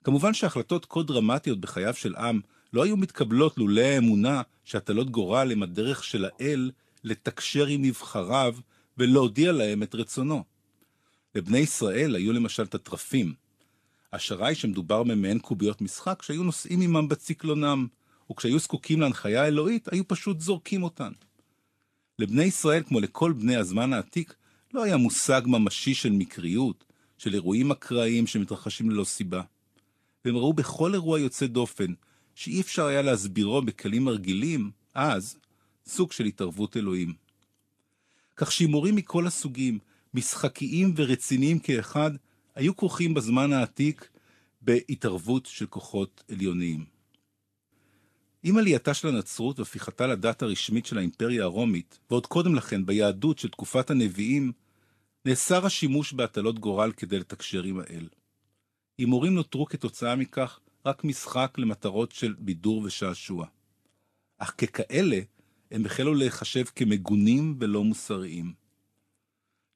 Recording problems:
garbled, watery; slightly; nothing above 13.5 kHz

